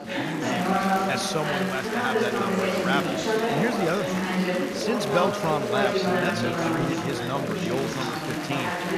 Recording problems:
chatter from many people; very loud; throughout; 4 dB above the speech

